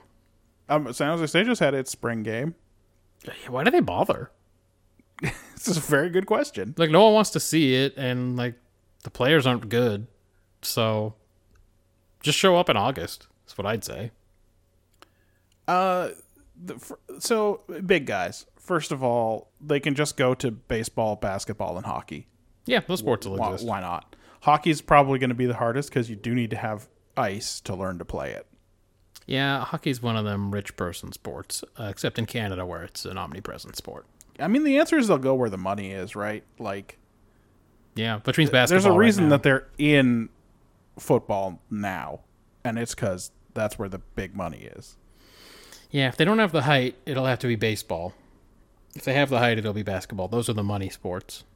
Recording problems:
none

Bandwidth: 16.5 kHz